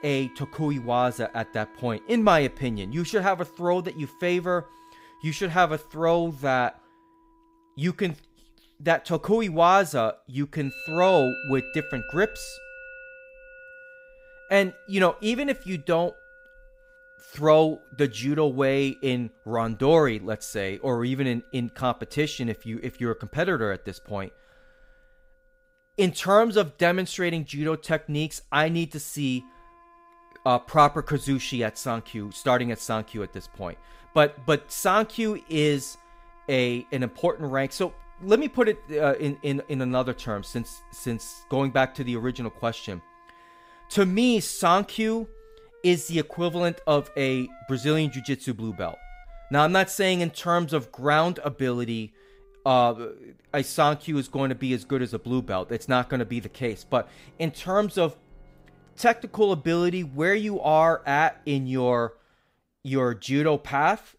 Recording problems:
background music; faint; throughout; 20 dB below the speech

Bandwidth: 15.5 kHz